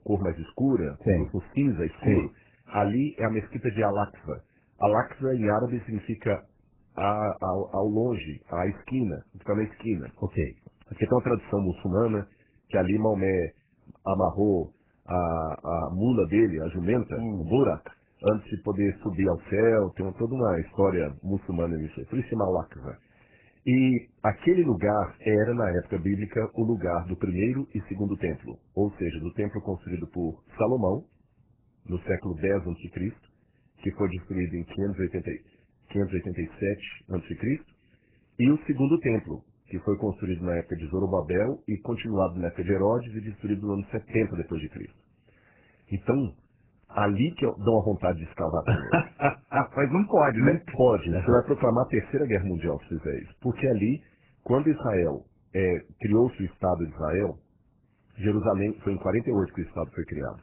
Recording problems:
garbled, watery; badly; nothing above 2.5 kHz

